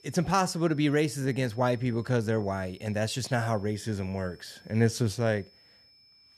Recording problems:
high-pitched whine; faint; throughout; 5.5 kHz, 30 dB below the speech

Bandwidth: 13.5 kHz